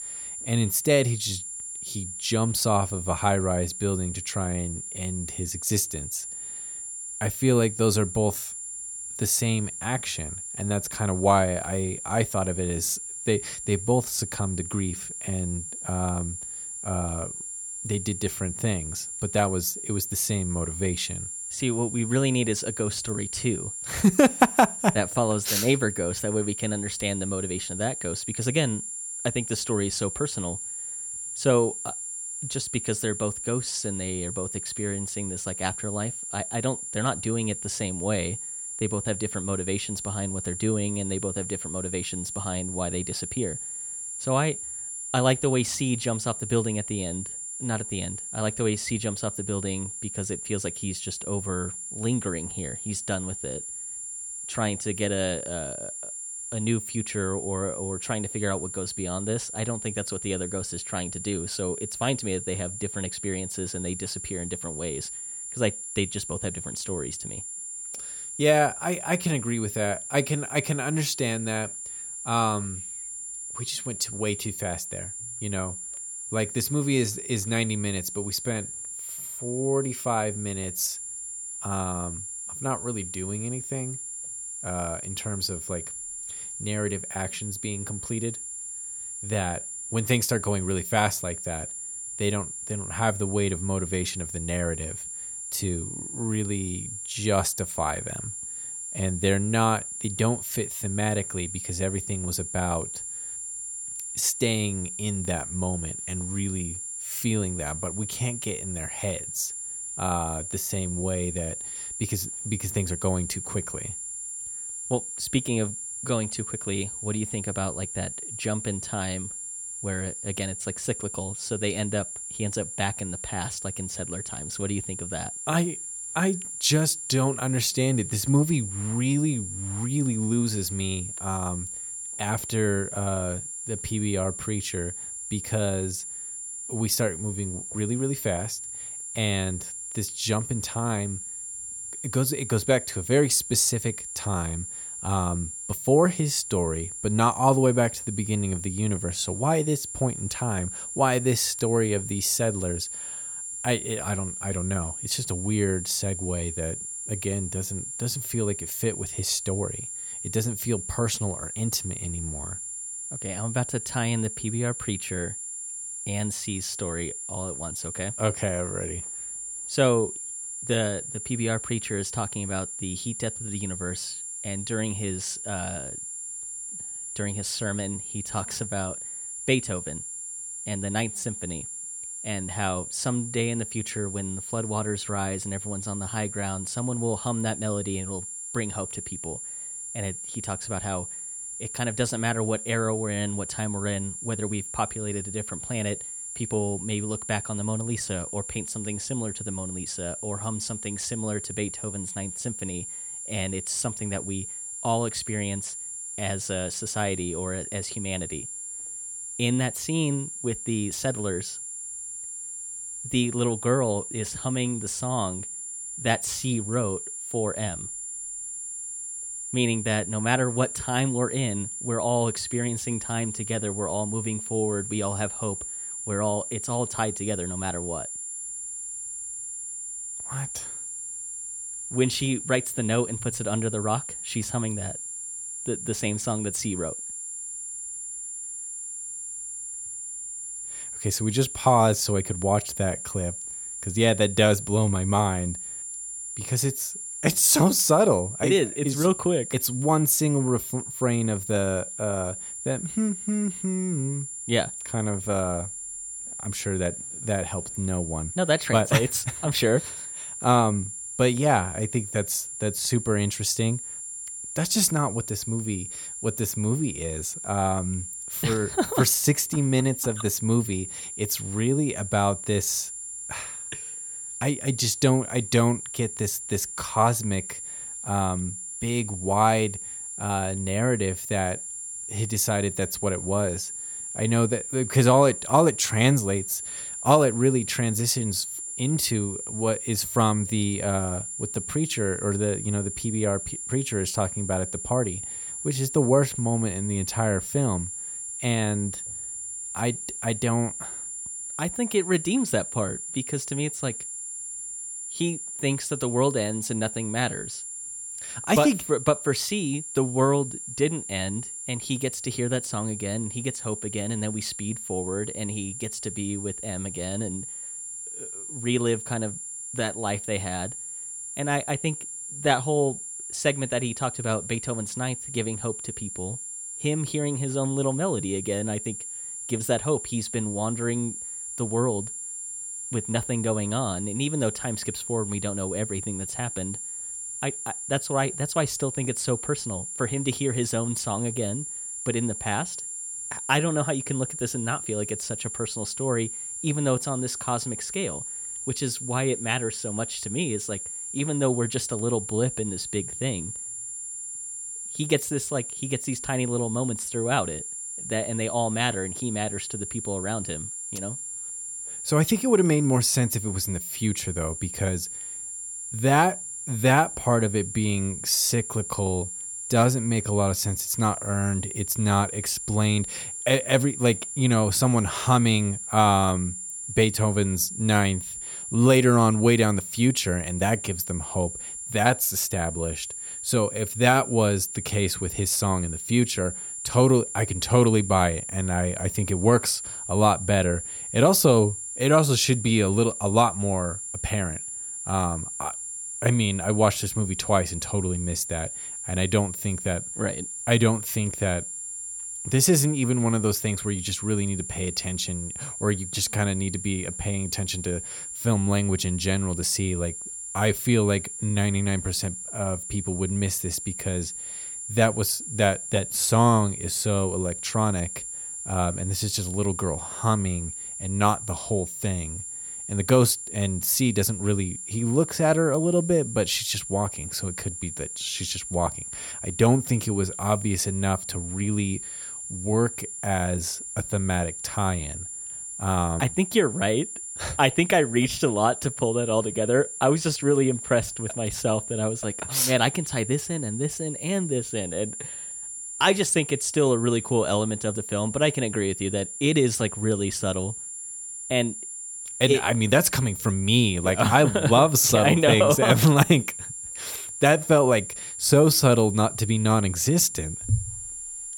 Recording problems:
high-pitched whine; loud; throughout; 7.5 kHz, 6 dB below the speech

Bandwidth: 17.5 kHz